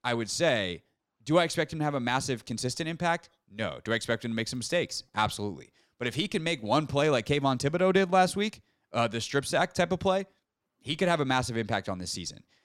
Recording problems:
none

